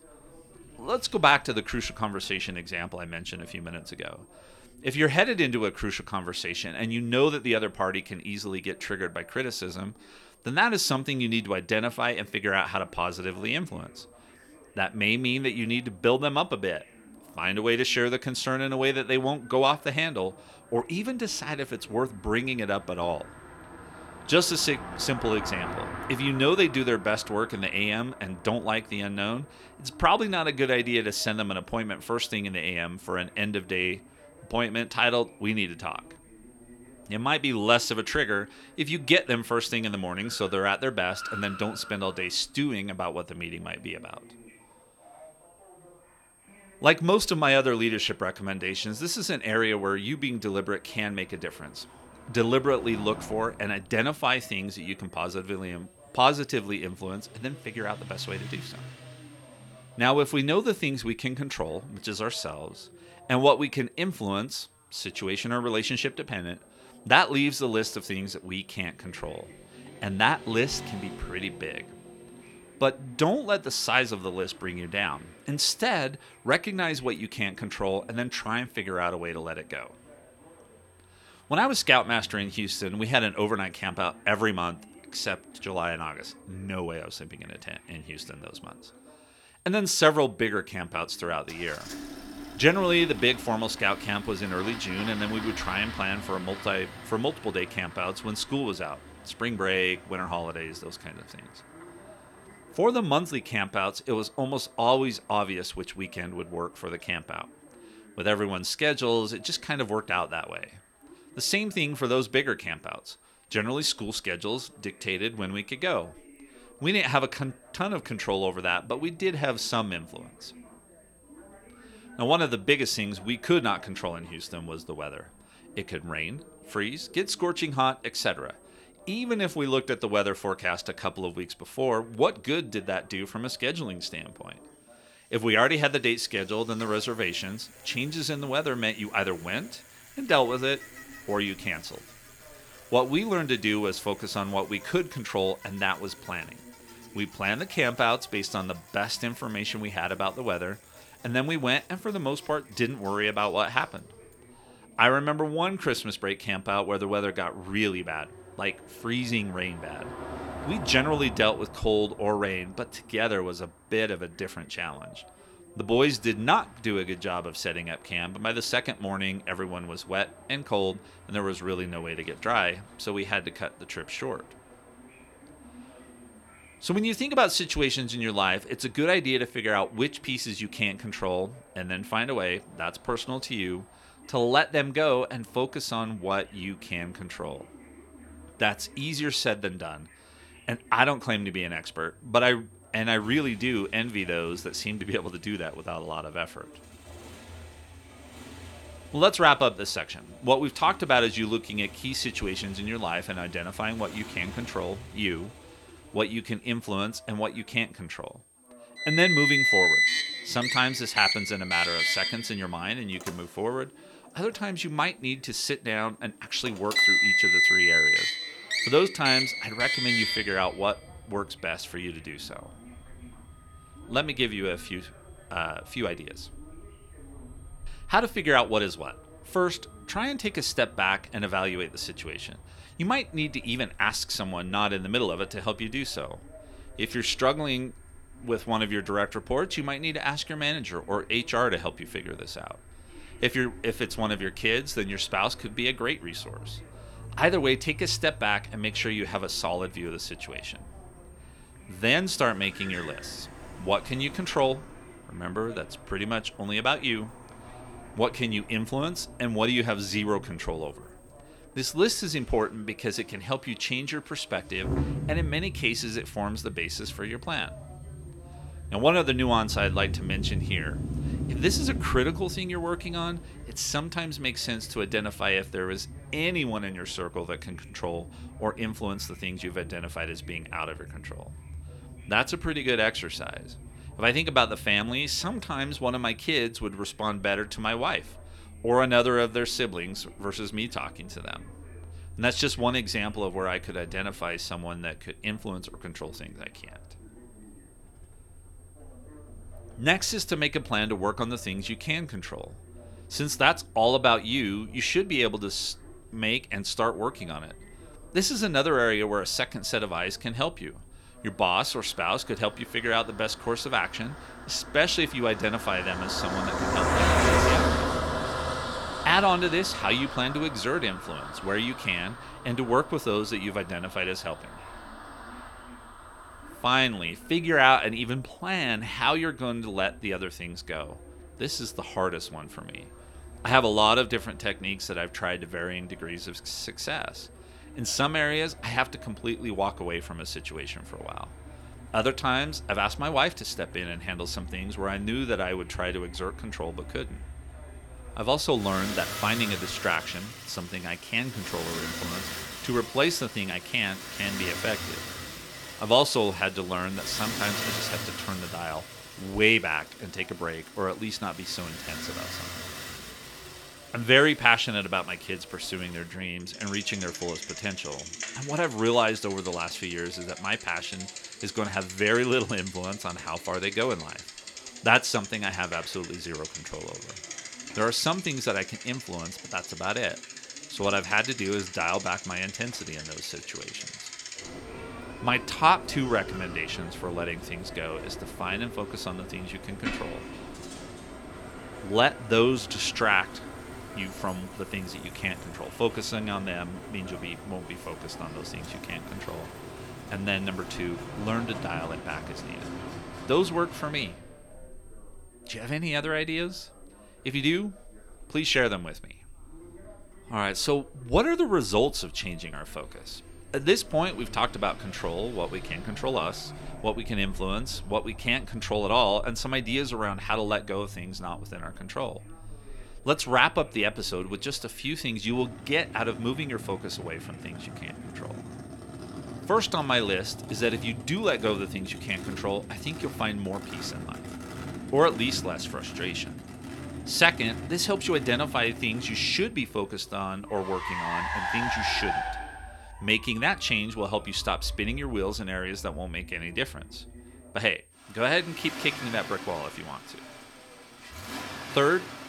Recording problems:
traffic noise; loud; throughout; 6 dB below the speech
high-pitched whine; faint; throughout; 8.5 kHz, 30 dB below the speech
background chatter; faint; throughout; 2 voices, 25 dB below the speech

